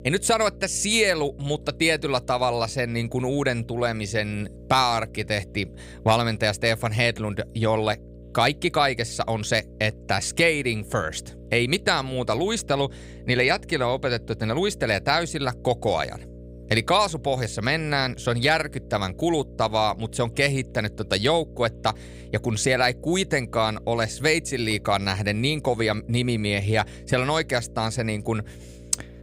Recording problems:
electrical hum; faint; throughout; 60 Hz, 25 dB below the speech

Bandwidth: 15.5 kHz